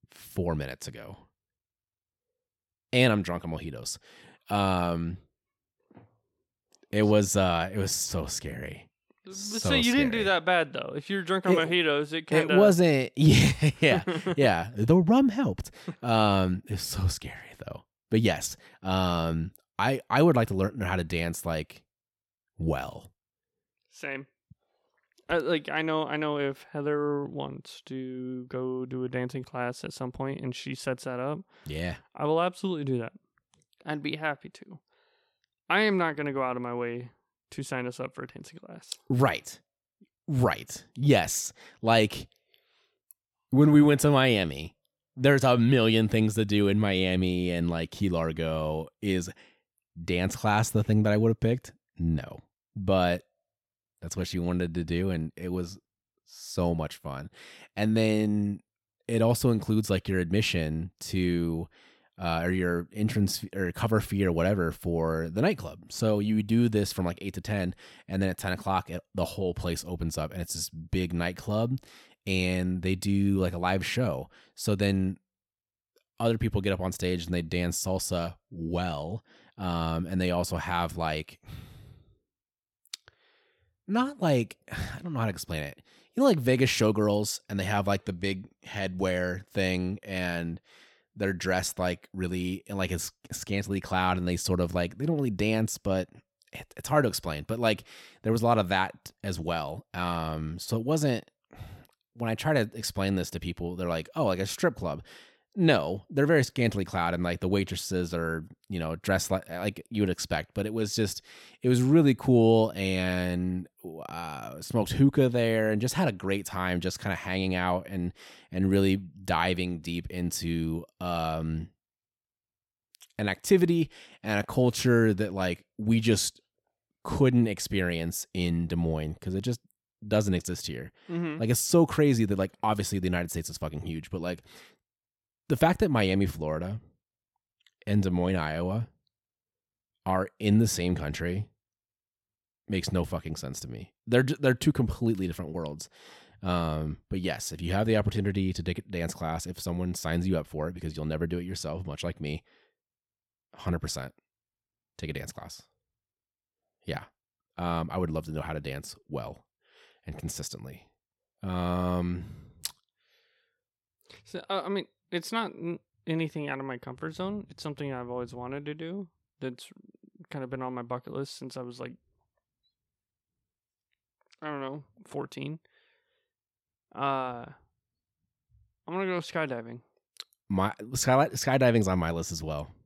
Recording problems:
none

